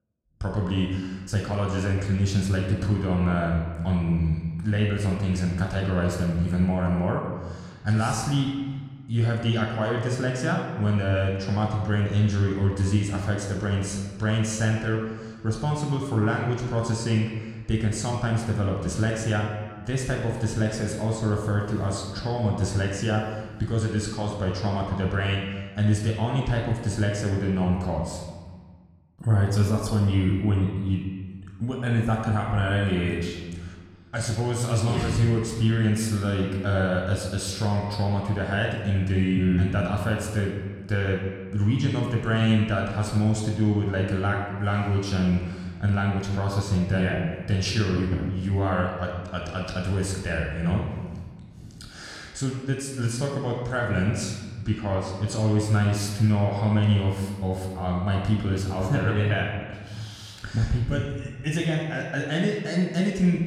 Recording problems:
room echo; noticeable; dies away in 1.3 s
off-mic speech; somewhat distant

